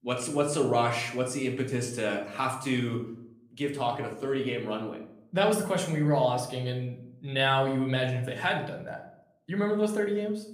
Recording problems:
room echo; slight; dies away in 0.5 s
off-mic speech; somewhat distant

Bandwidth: 15 kHz